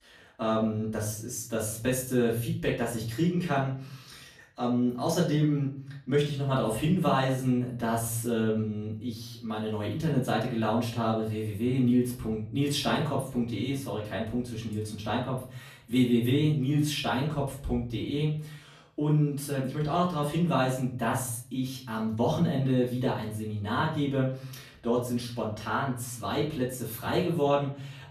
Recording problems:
off-mic speech; far
room echo; slight; dies away in 0.5 s

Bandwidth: 14.5 kHz